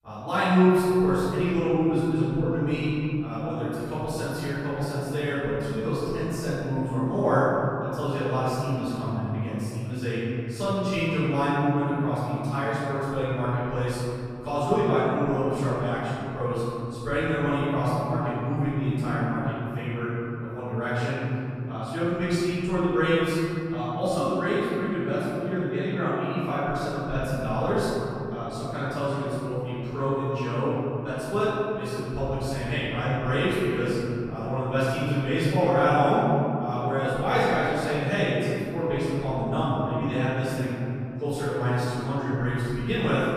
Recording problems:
room echo; strong; dies away in 3 s
off-mic speech; far

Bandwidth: 14.5 kHz